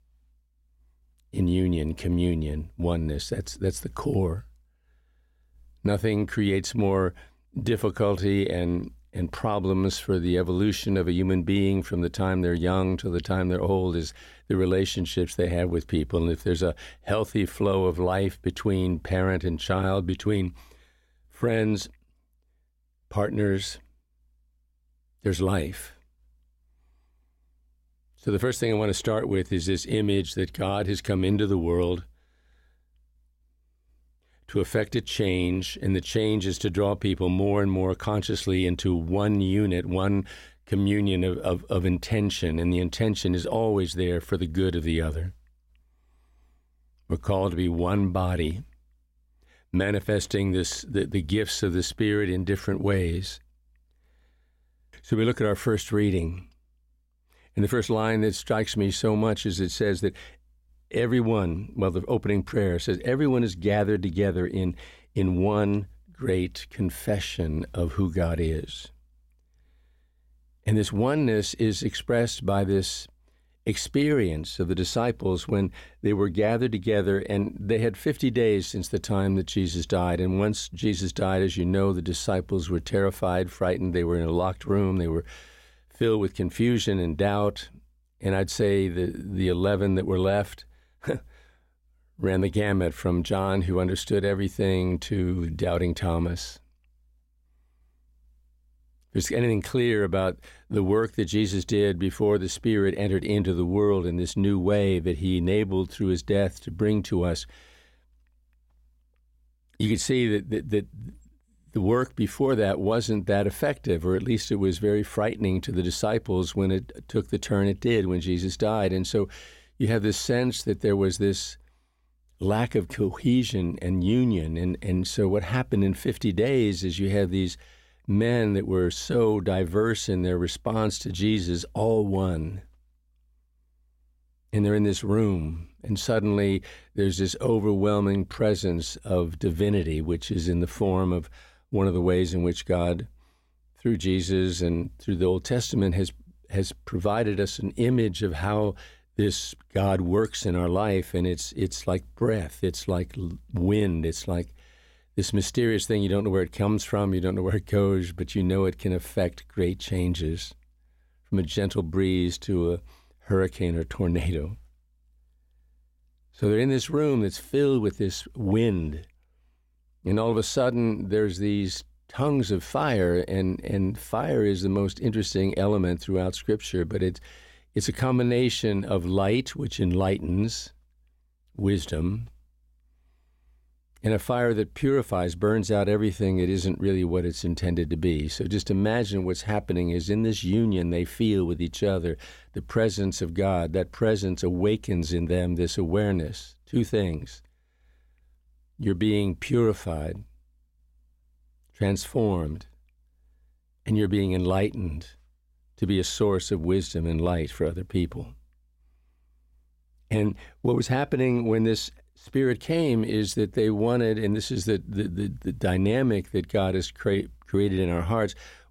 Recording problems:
none

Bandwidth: 16.5 kHz